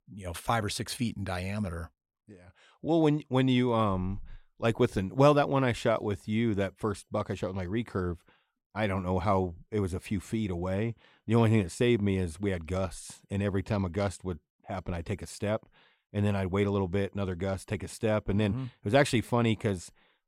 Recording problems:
none

